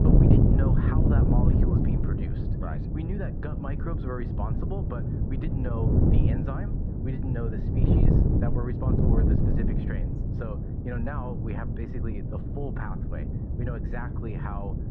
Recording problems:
muffled; very; fading above 1.5 kHz
wind noise on the microphone; heavy; 3 dB above the speech

